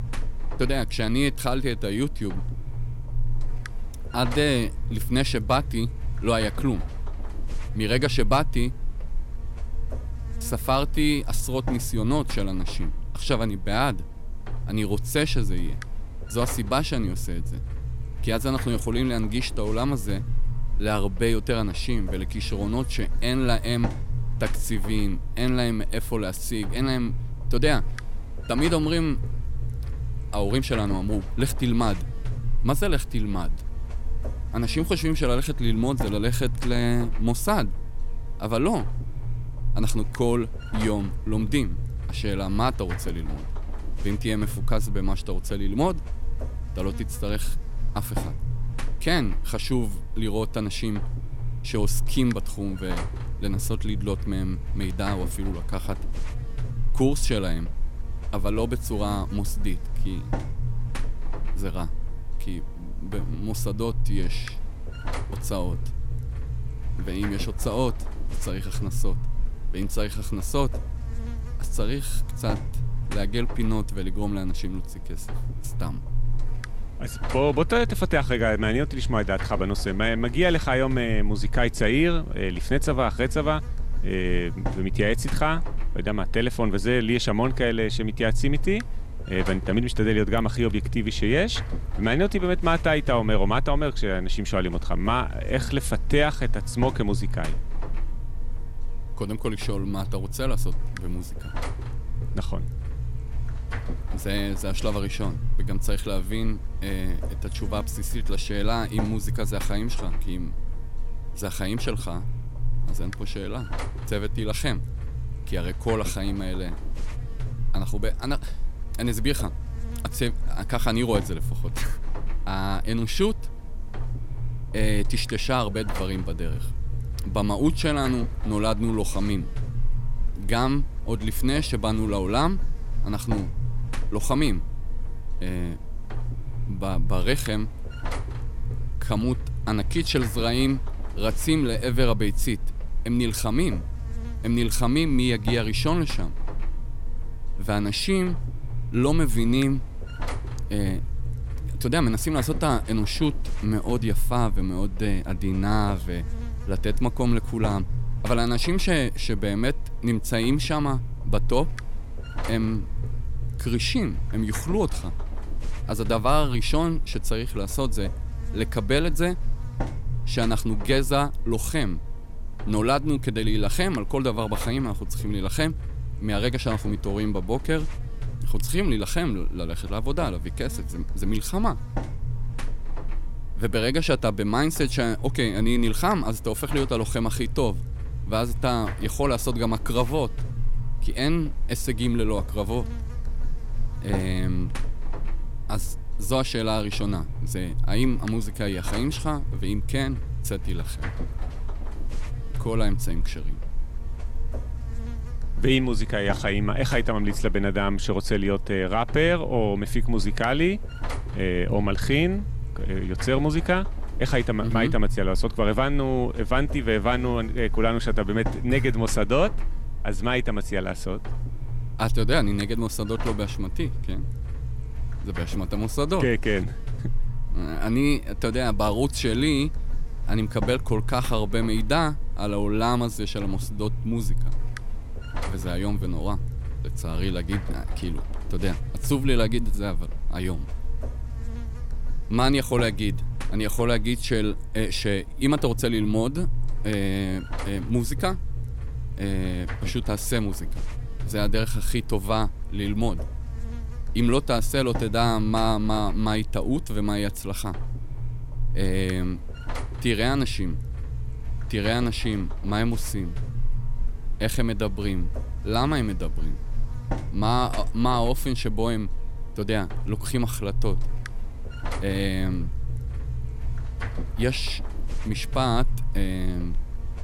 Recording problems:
electrical hum; very faint; throughout; 60 Hz, 15 dB below the speech

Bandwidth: 16.5 kHz